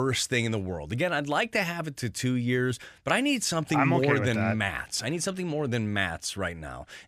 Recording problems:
abrupt cut into speech; at the start

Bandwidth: 14.5 kHz